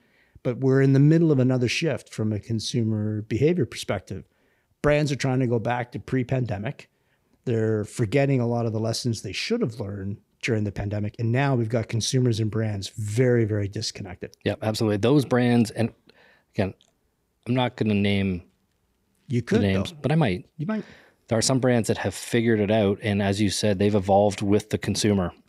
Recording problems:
uneven, jittery; strongly; from 2 to 22 s

